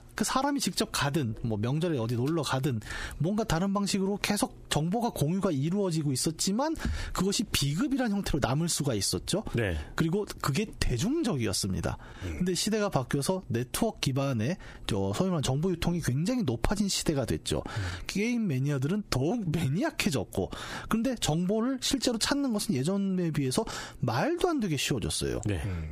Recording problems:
squashed, flat; heavily

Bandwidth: 15 kHz